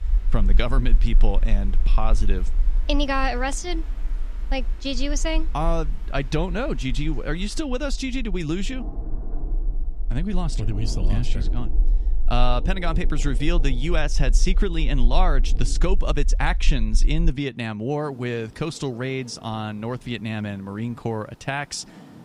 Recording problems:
rain or running water; noticeable; throughout; 15 dB below the speech
low rumble; faint; until 17 s; 25 dB below the speech

